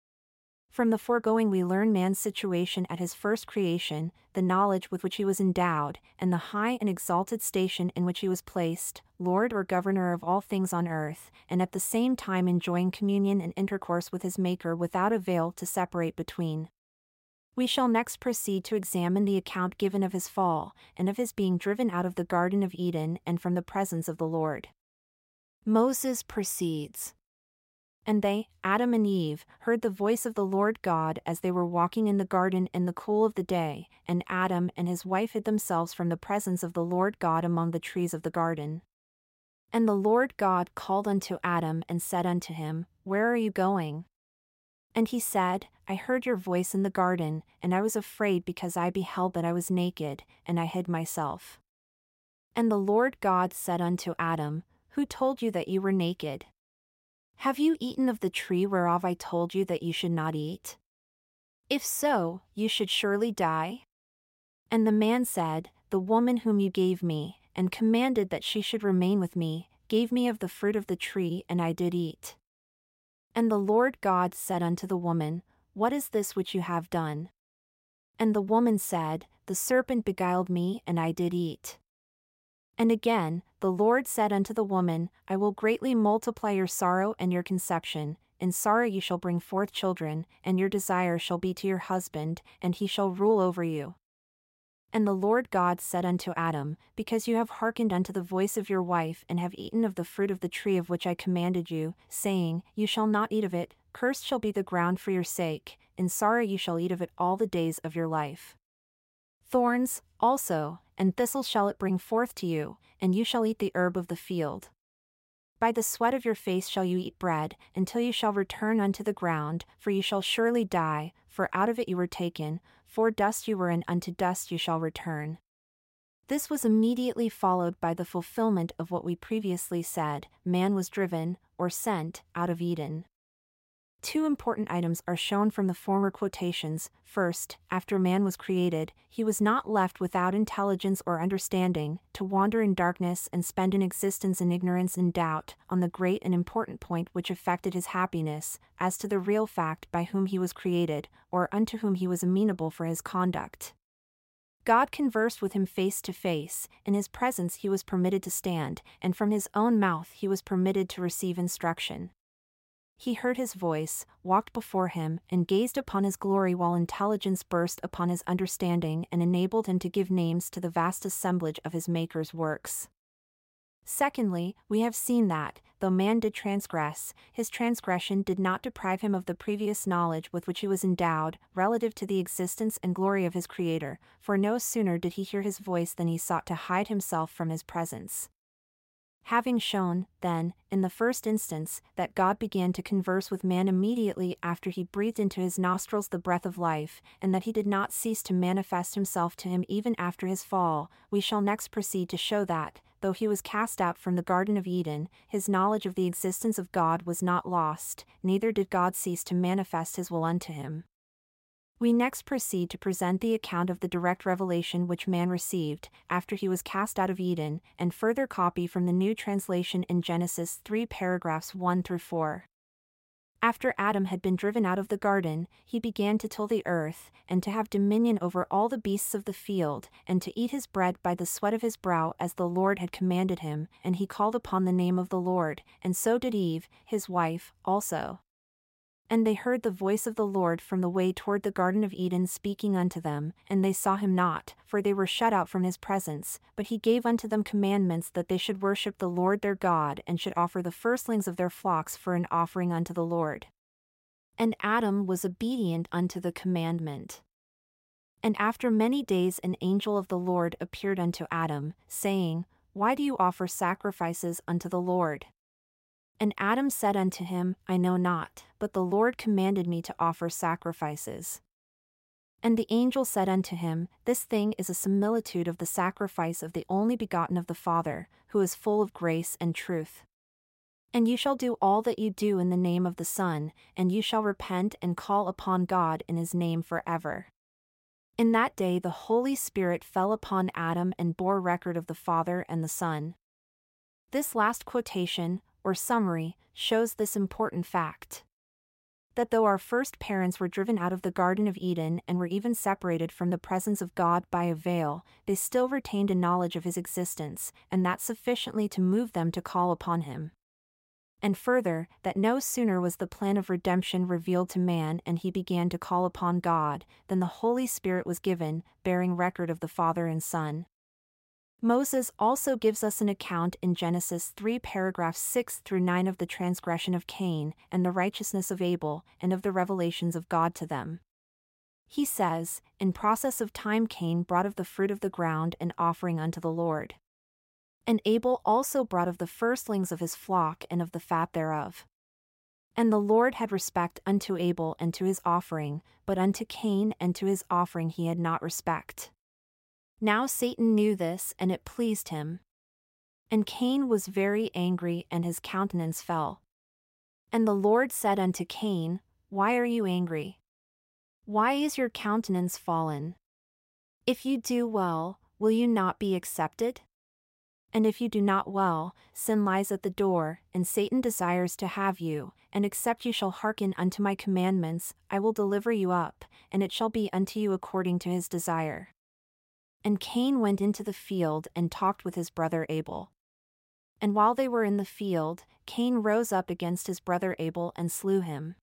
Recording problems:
none

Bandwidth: 16 kHz